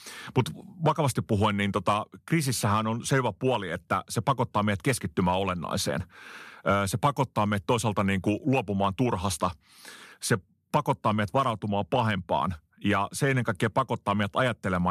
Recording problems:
abrupt cut into speech; at the end

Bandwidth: 14 kHz